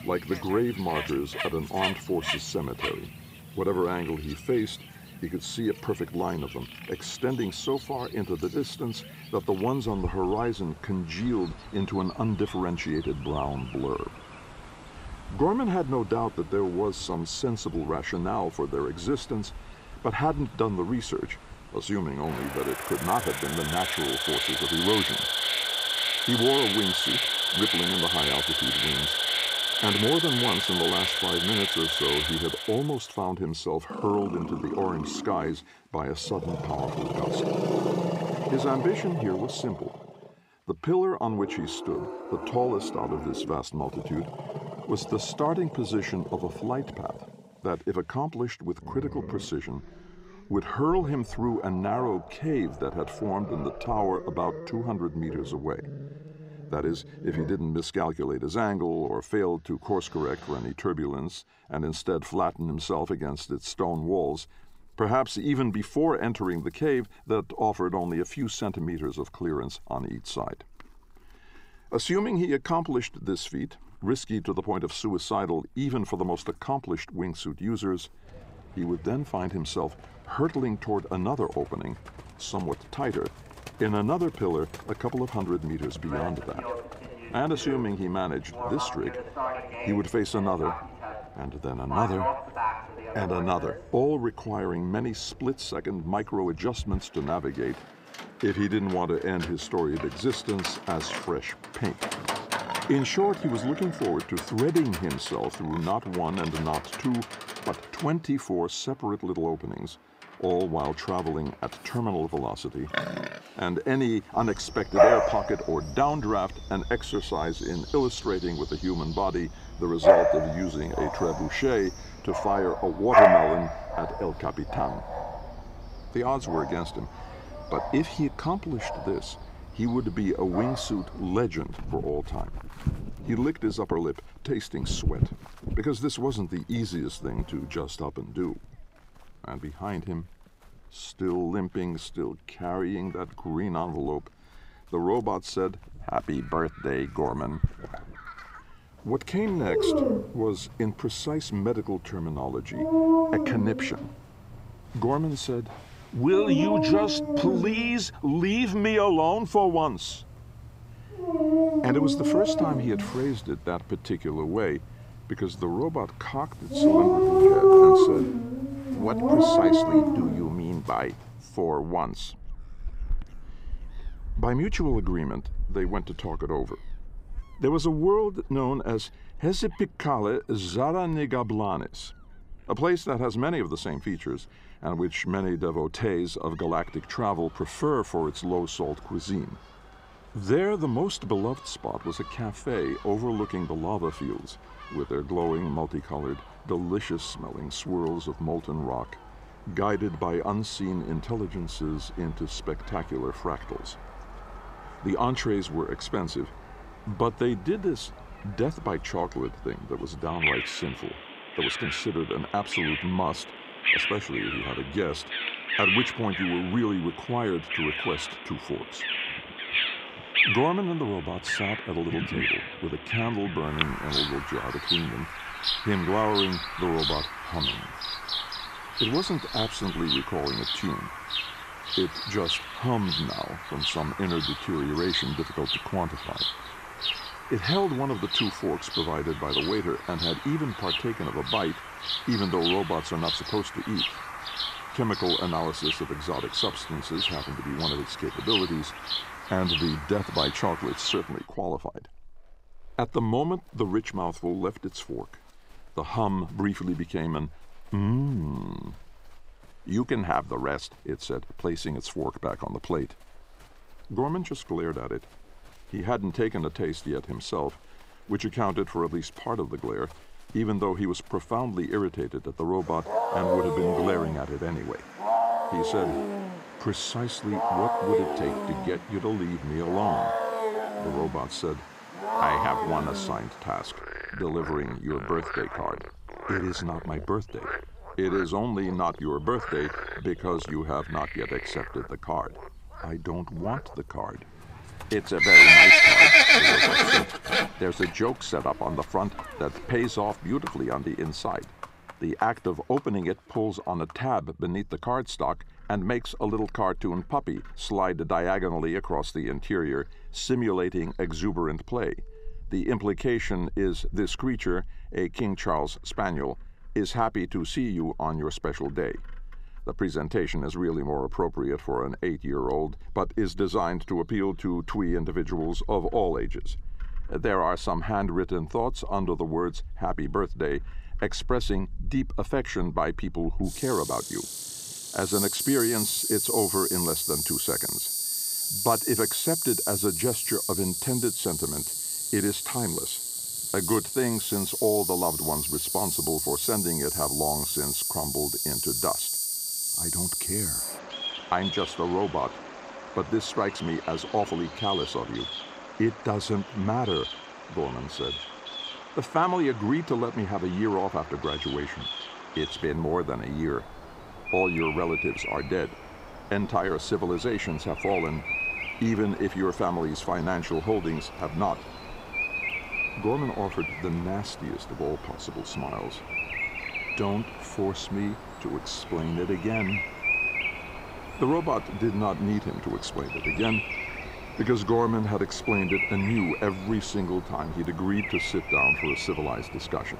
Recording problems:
animal sounds; very loud; throughout; 3 dB above the speech

